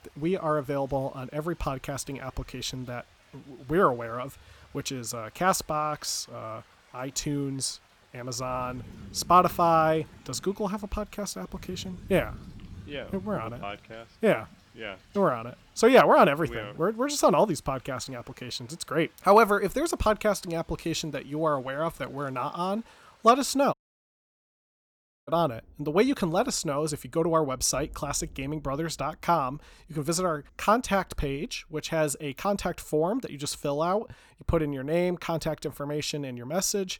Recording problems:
rain or running water; faint; throughout; 25 dB below the speech
audio cutting out; at 24 s for 1.5 s

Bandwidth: 18.5 kHz